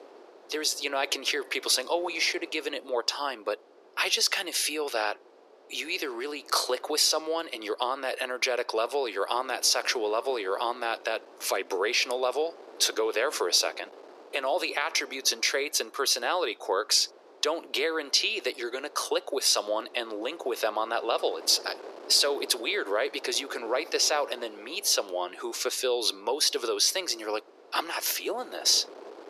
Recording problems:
thin; very; fading below 400 Hz
wind noise on the microphone; occasional gusts; 20 dB below the speech

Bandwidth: 14.5 kHz